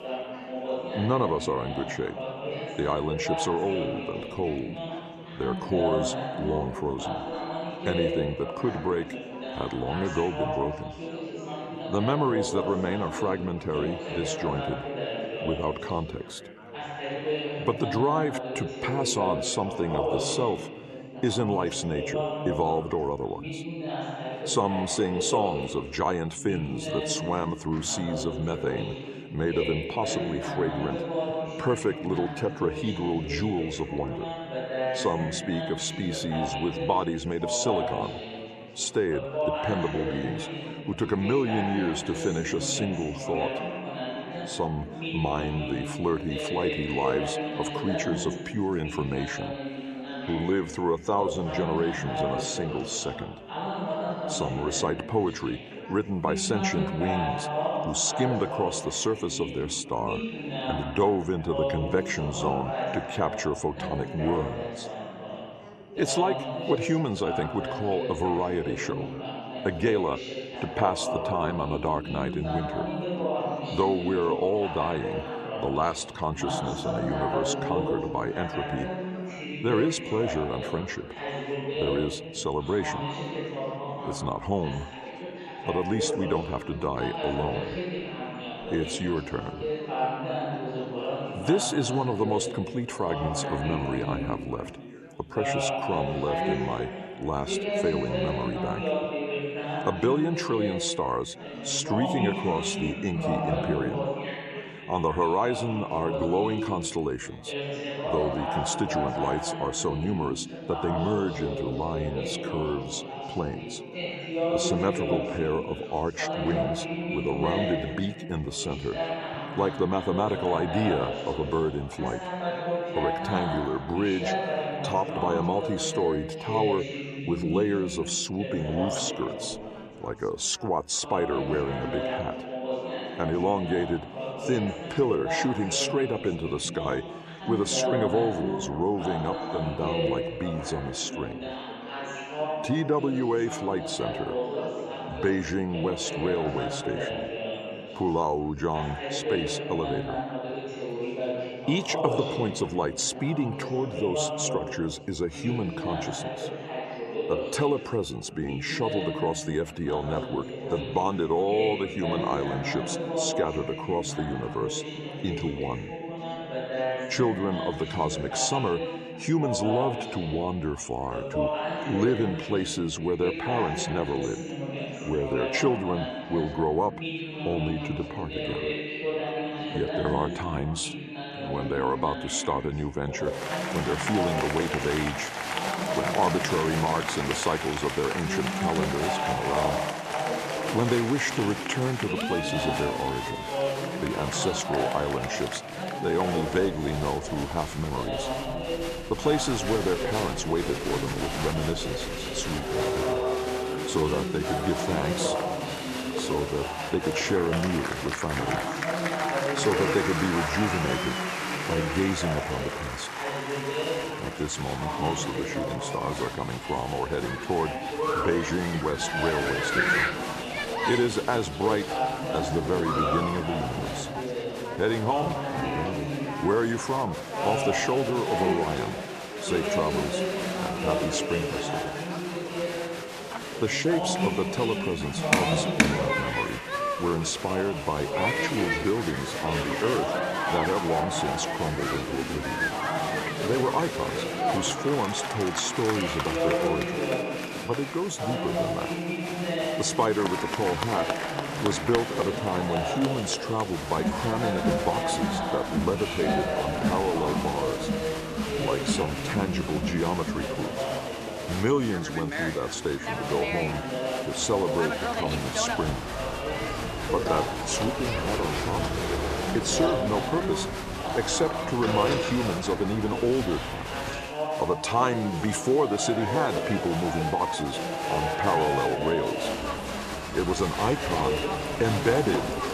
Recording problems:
chatter from many people; loud; throughout; 2 dB below the speech

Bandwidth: 14 kHz